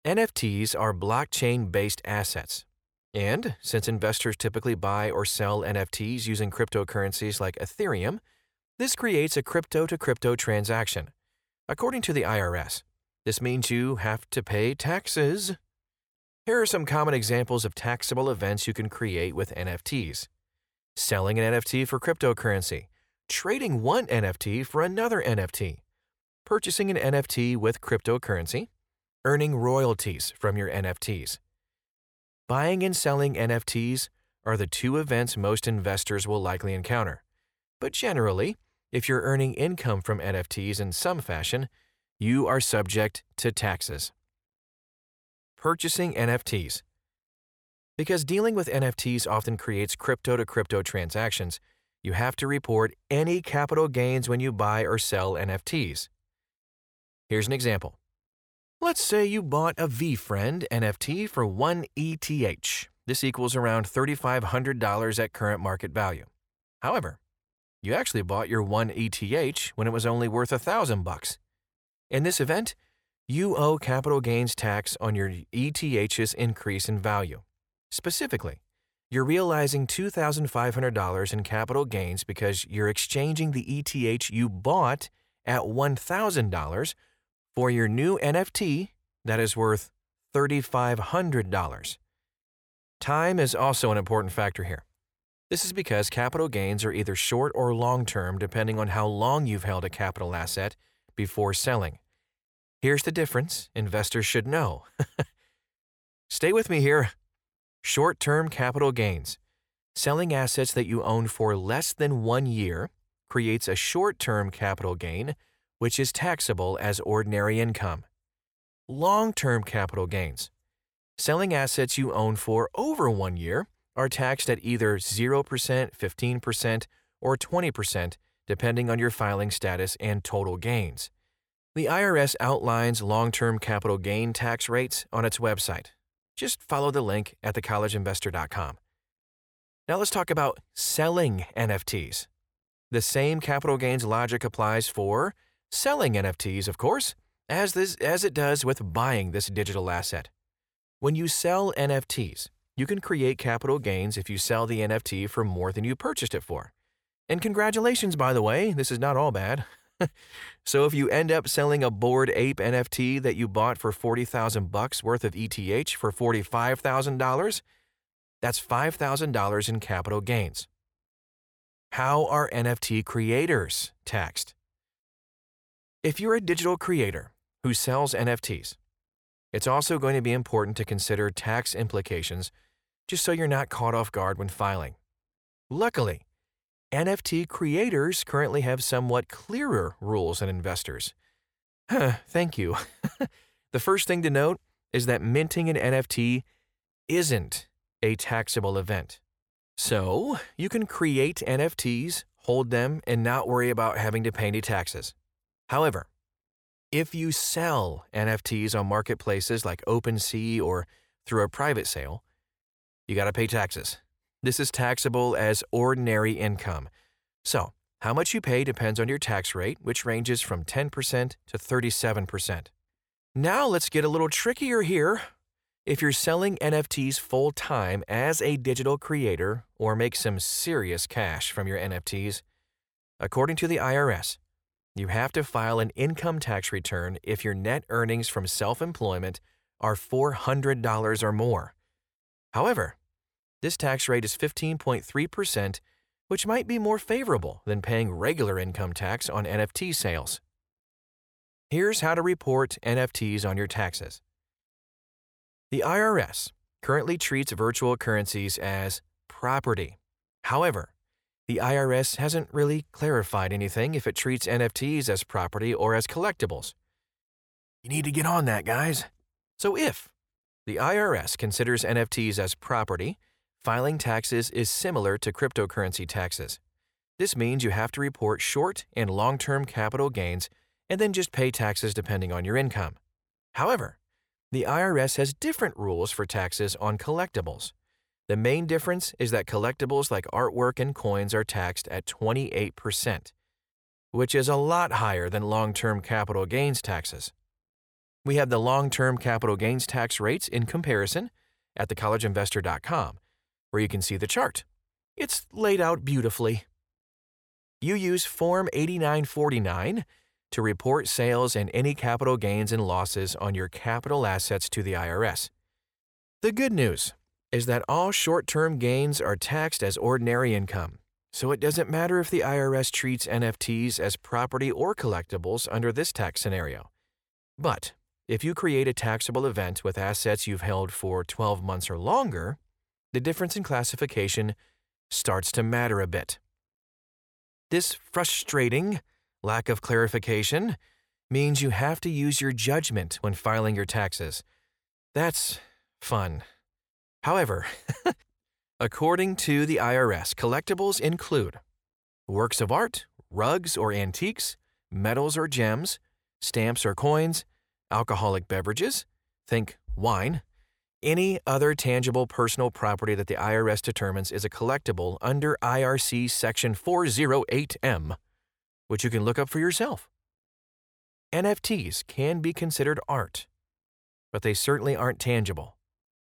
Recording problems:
none

